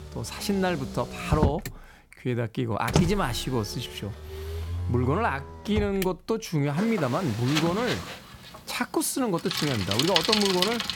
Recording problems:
traffic noise; loud; throughout; 2 dB below the speech

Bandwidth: 17 kHz